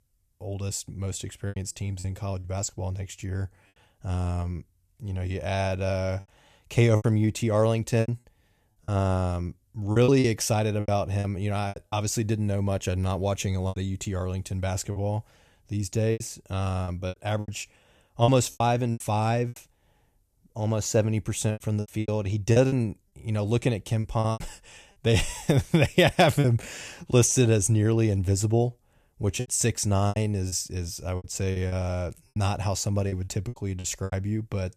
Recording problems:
choppy; very; 9% of the speech affected

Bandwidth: 14.5 kHz